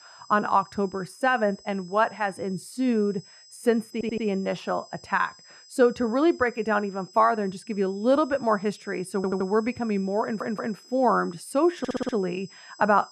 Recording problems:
muffled; very; fading above 2.5 kHz
high-pitched whine; faint; throughout; 5 kHz, 25 dB below the speech
audio stuttering; 4 times, first at 4 s

